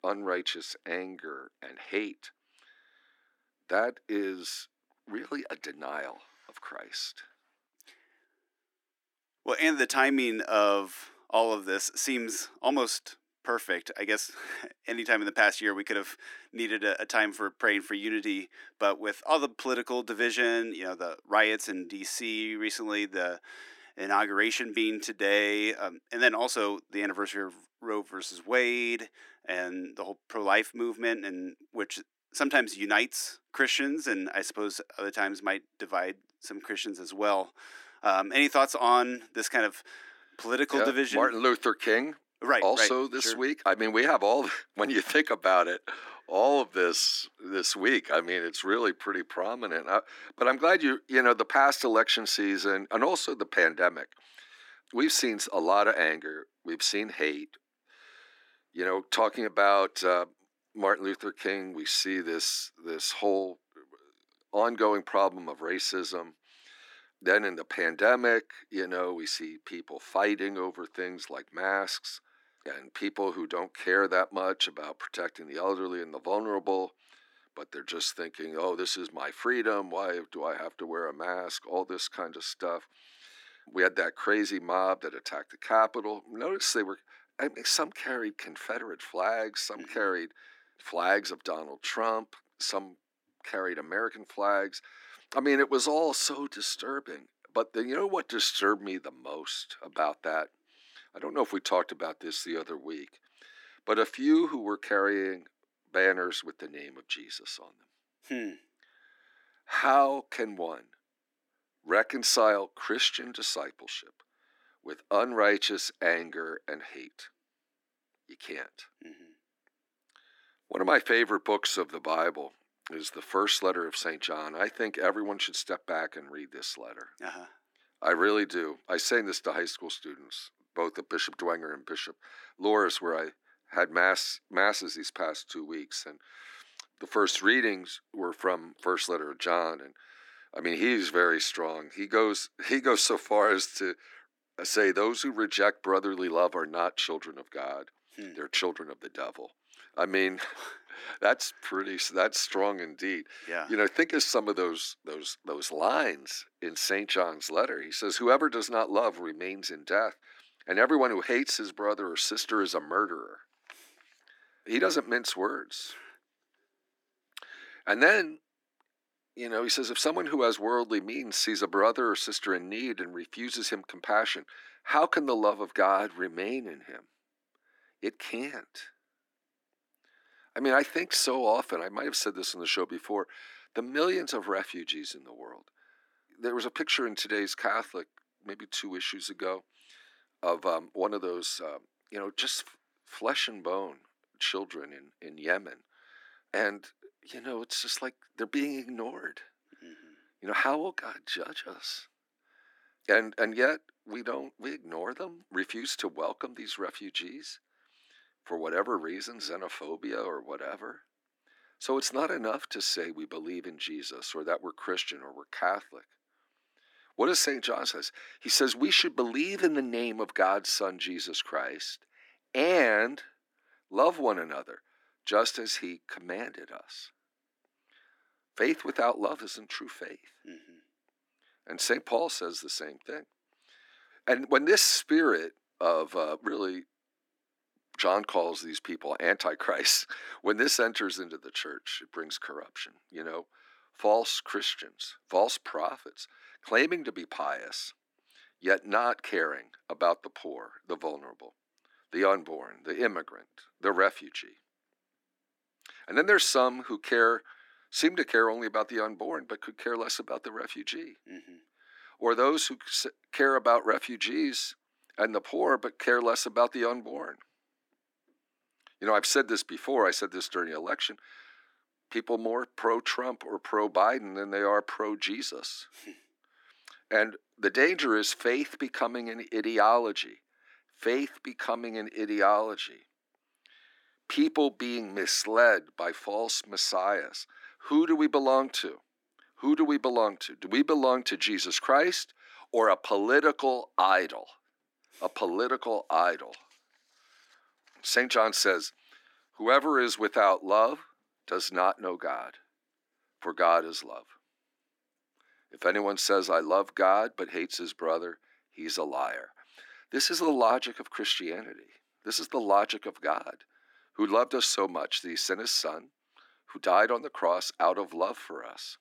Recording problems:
thin; somewhat; fading below 300 Hz

